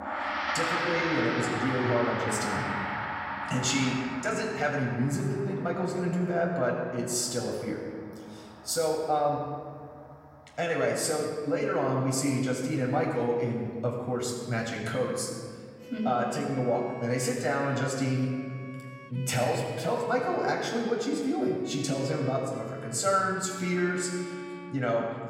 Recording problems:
off-mic speech; far
room echo; noticeable; dies away in 1.6 s
background music; loud; throughout; 7 dB below the speech

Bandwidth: 16.5 kHz